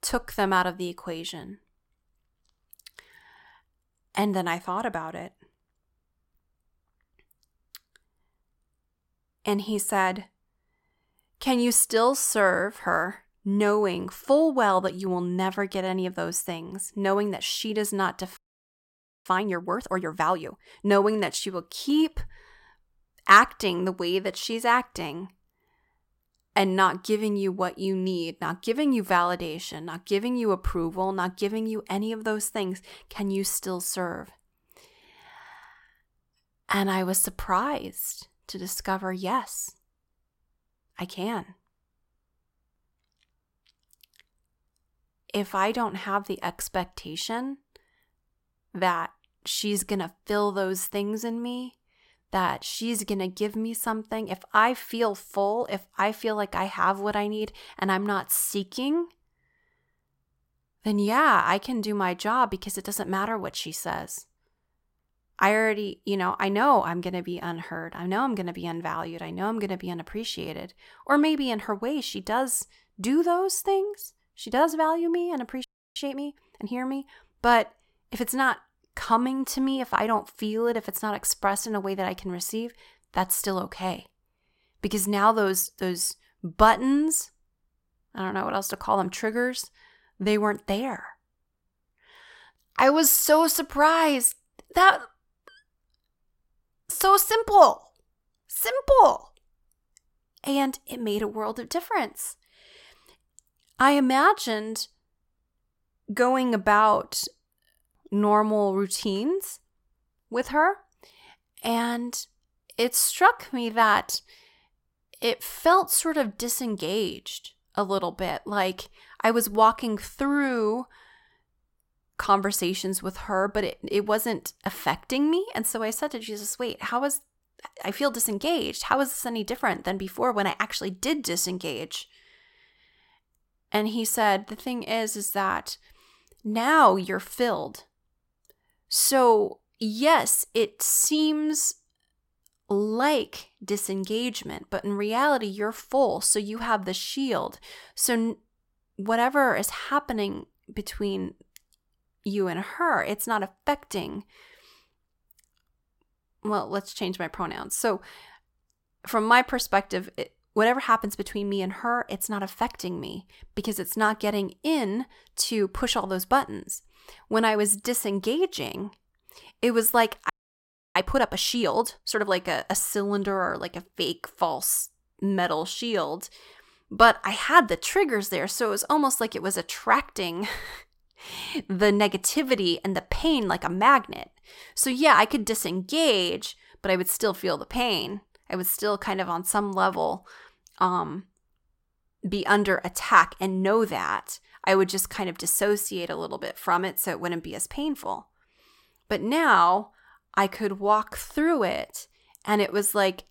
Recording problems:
audio freezing; at 18 s for 1 s, at 1:16 and at 2:50 for 0.5 s

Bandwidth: 16.5 kHz